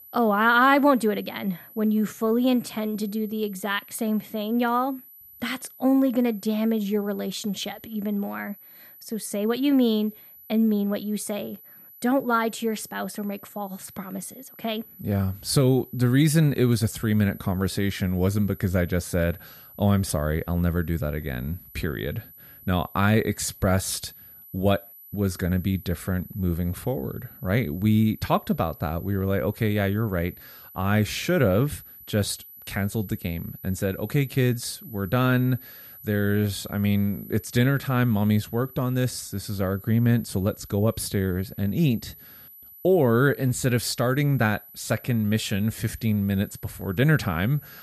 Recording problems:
high-pitched whine; noticeable; throughout; 12 kHz, 20 dB below the speech

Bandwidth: 14.5 kHz